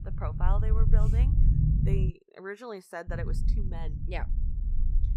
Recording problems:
low rumble; loud; until 2 s and from 3 s on; 4 dB below the speech

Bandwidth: 15.5 kHz